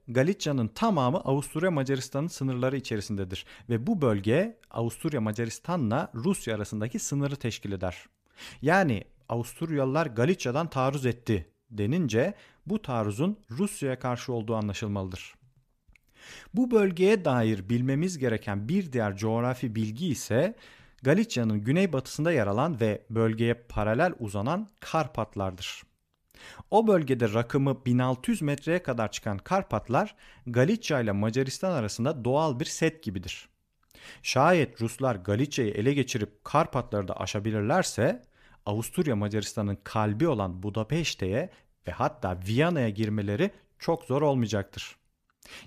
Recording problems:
none

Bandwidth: 14.5 kHz